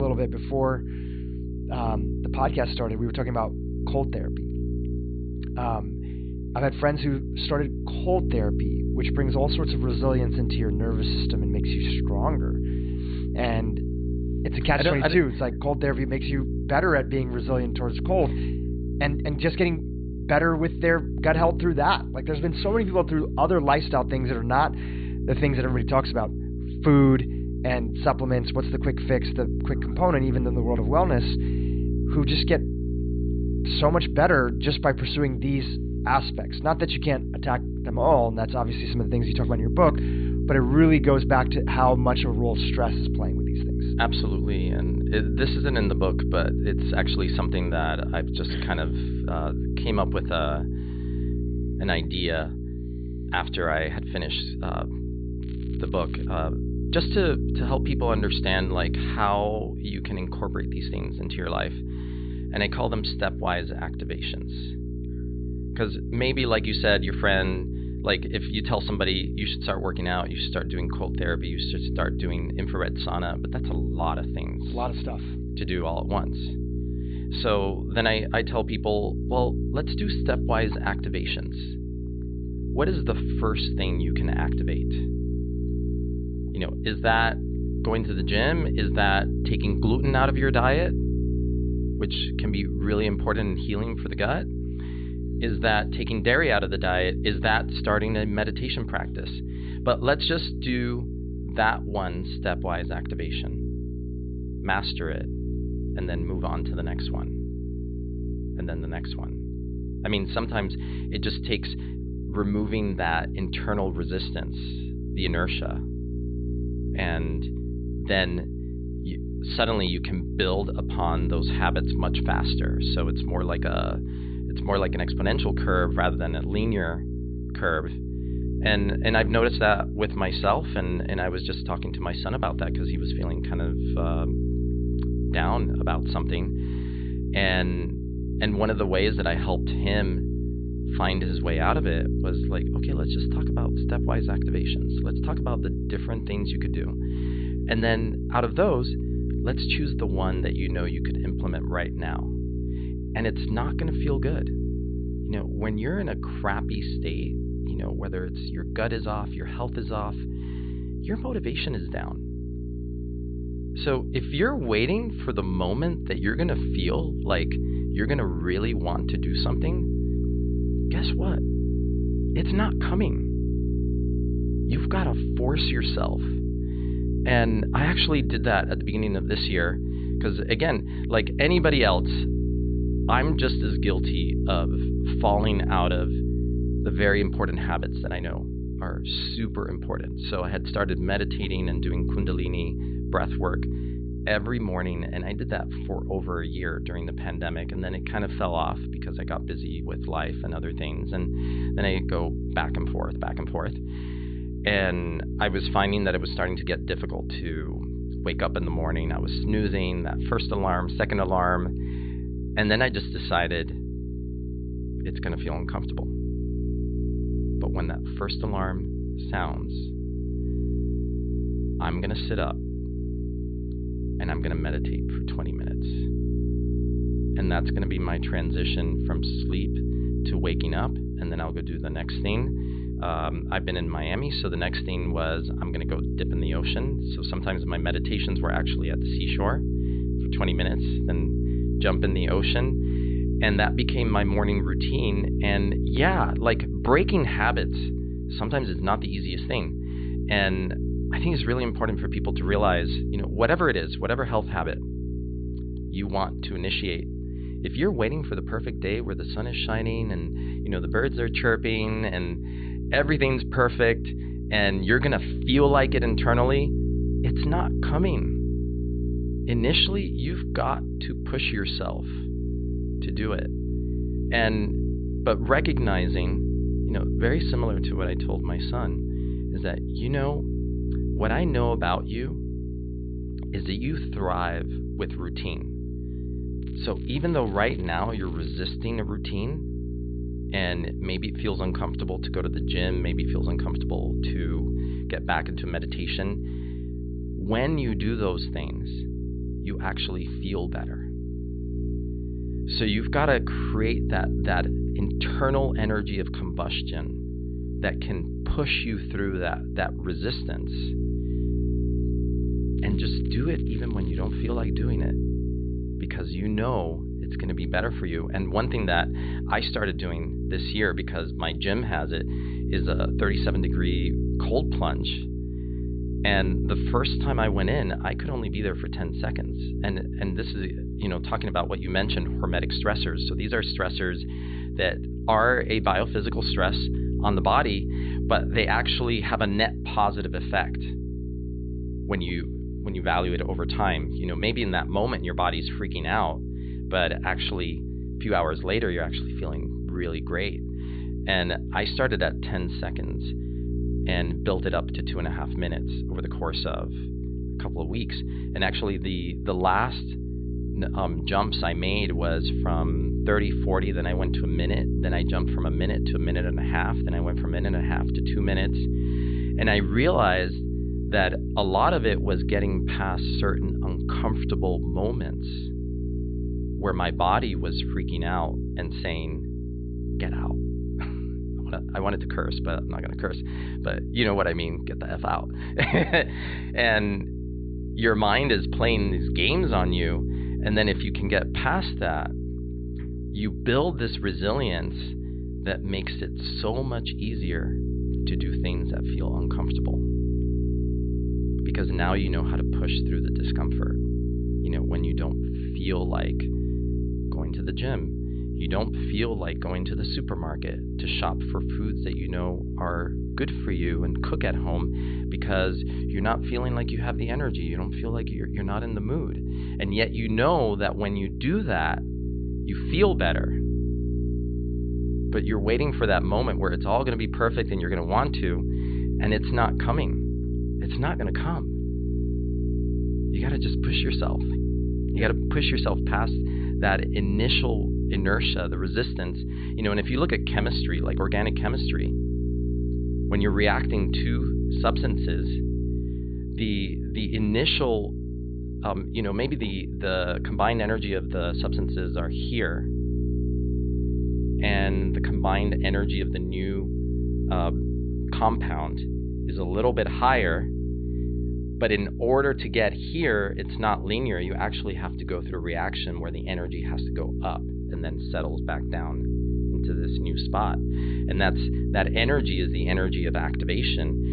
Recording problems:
high frequencies cut off; severe; nothing above 4.5 kHz
electrical hum; noticeable; throughout; 60 Hz, 10 dB below the speech
crackling; faint; at 55 s, from 4:47 to 4:49 and from 5:13 to 5:15; 25 dB below the speech
abrupt cut into speech; at the start

